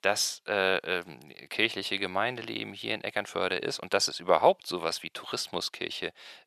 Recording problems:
thin; very; fading below 650 Hz

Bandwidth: 13.5 kHz